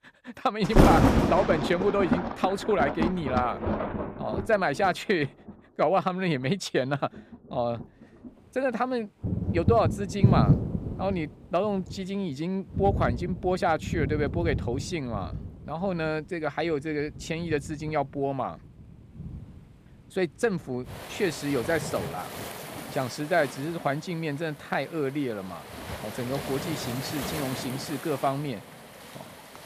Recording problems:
rain or running water; loud; throughout; 1 dB below the speech

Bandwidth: 15 kHz